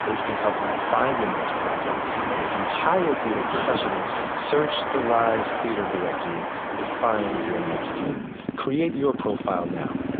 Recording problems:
phone-call audio; poor line; nothing above 3.5 kHz
traffic noise; loud; throughout; as loud as the speech

